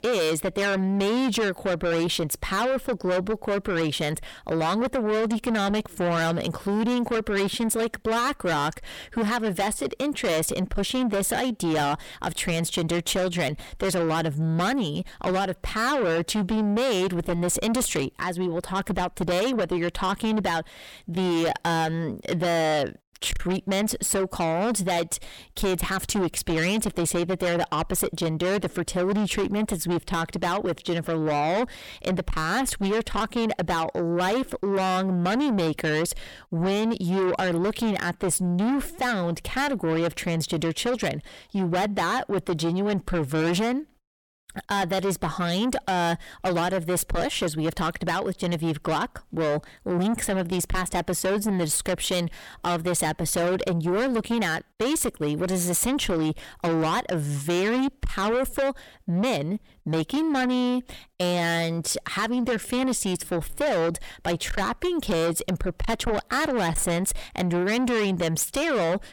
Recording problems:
distortion; heavy; 7 dB below the speech

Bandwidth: 17.5 kHz